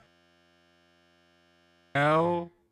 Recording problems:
wrong speed, natural pitch; too slow; 0.5 times normal speed
audio freezing; at the start for 2 s

